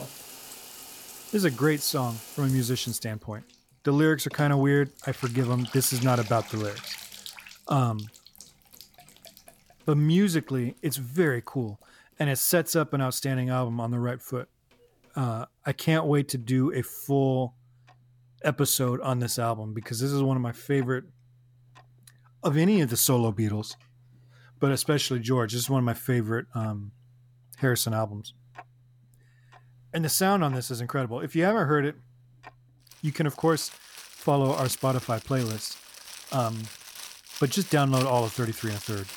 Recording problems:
household noises; noticeable; throughout; 15 dB below the speech

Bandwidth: 17.5 kHz